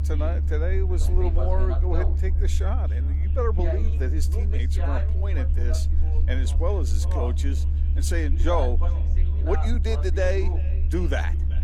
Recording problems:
echo of what is said; faint; throughout; 380 ms later, 20 dB below the speech
voice in the background; loud; throughout; 8 dB below the speech
low rumble; noticeable; throughout; 10 dB below the speech
electrical hum; faint; throughout; 50 Hz, 20 dB below the speech

